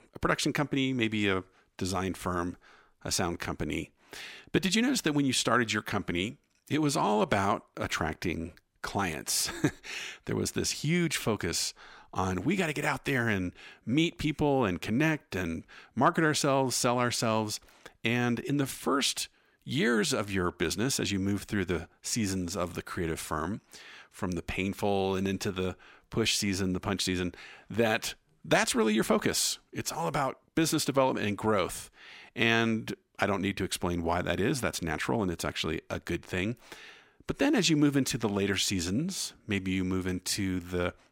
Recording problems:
none

